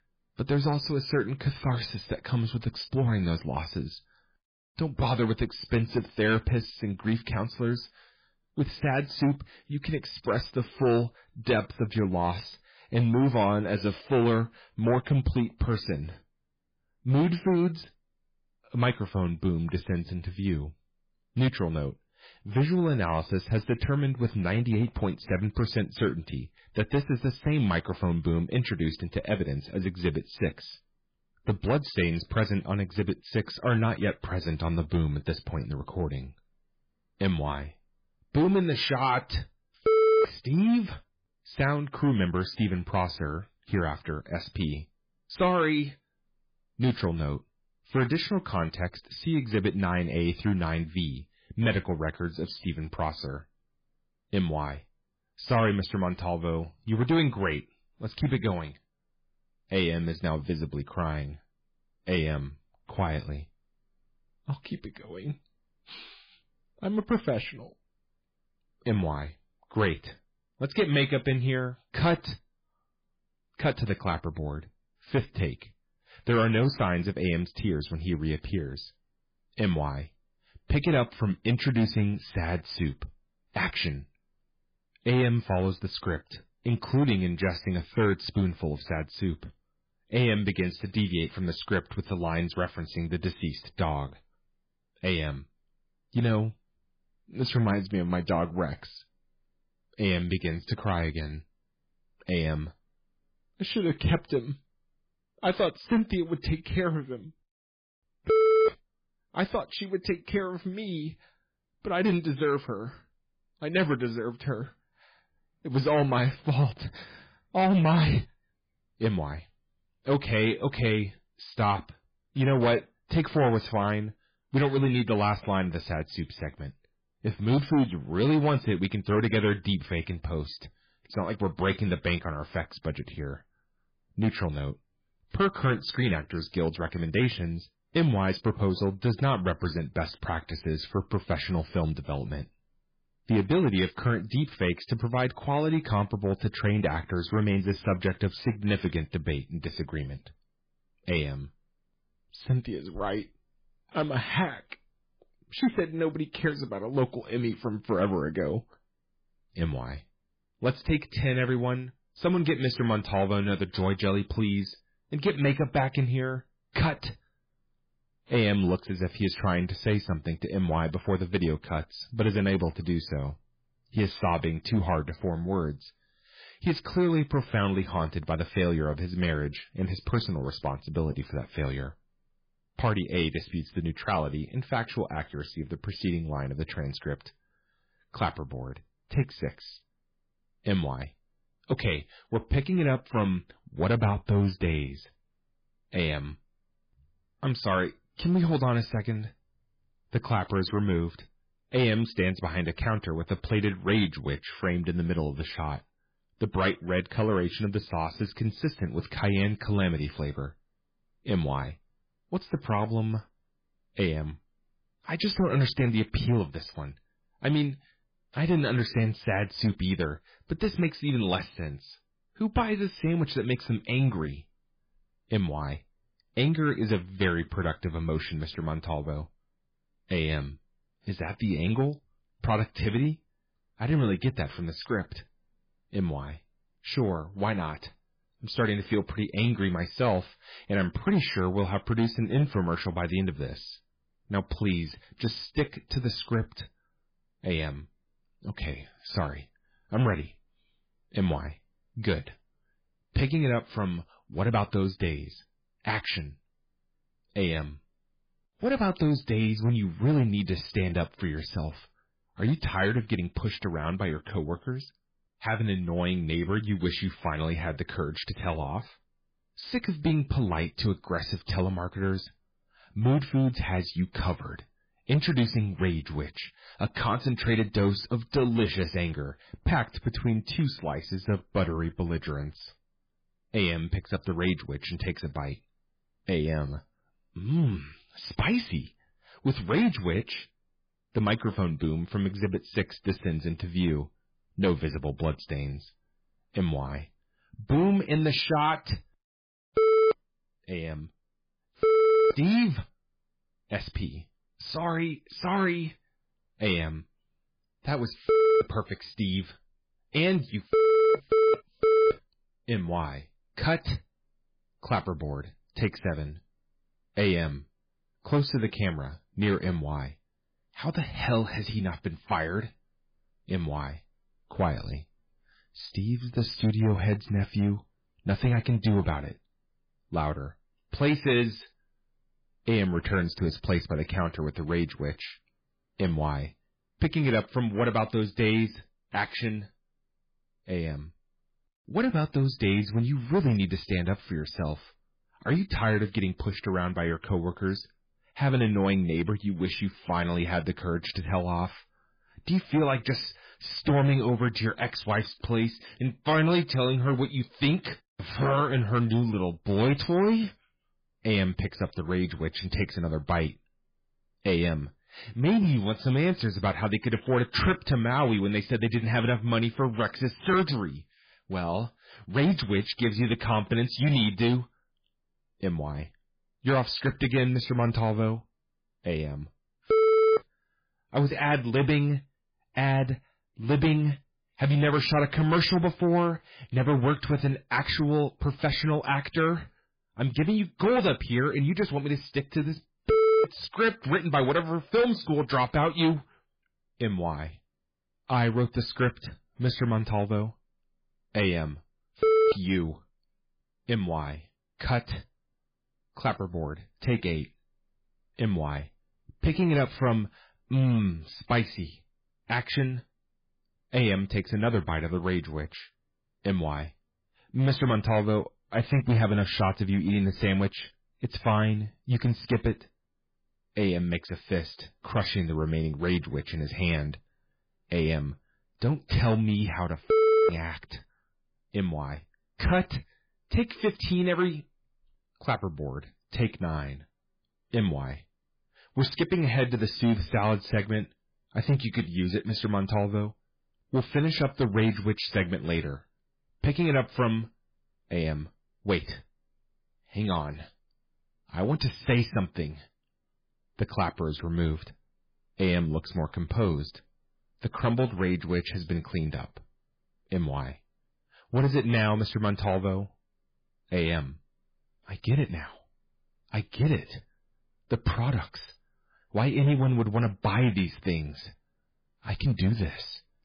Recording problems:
garbled, watery; badly; nothing above 5 kHz
distortion; slight; 4% of the sound clipped

